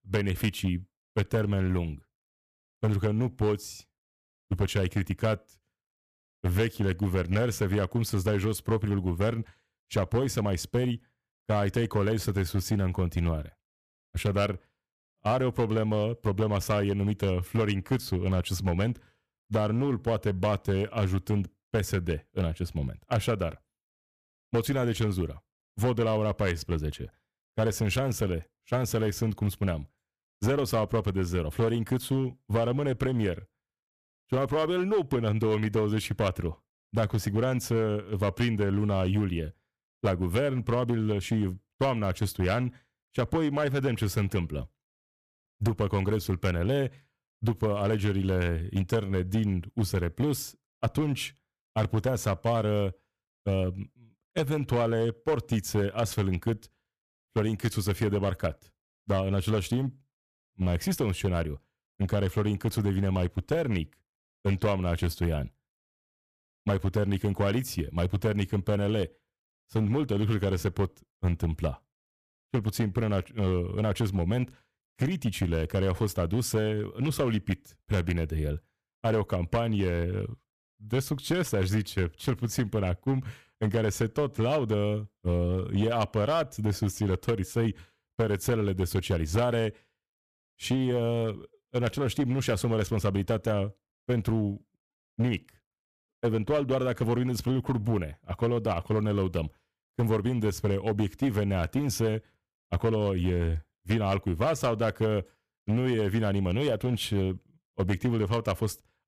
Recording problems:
distortion; slight; 7% of the sound clipped

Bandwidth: 14.5 kHz